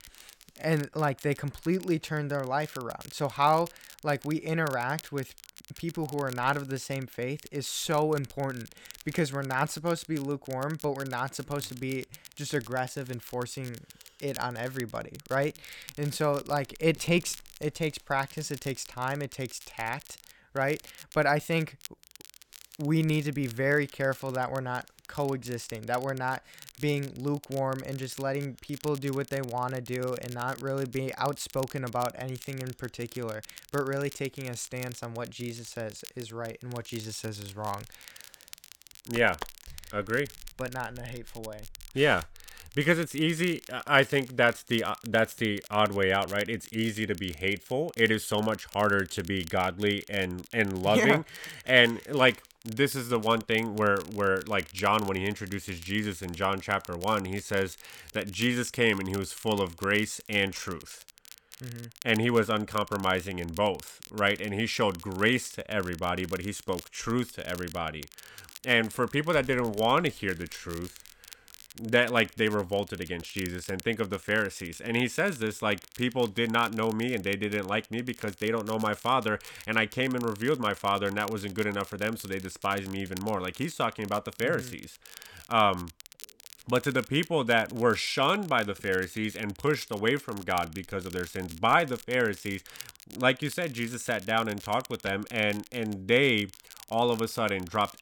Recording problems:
crackle, like an old record; noticeable; 20 dB below the speech

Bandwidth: 17.5 kHz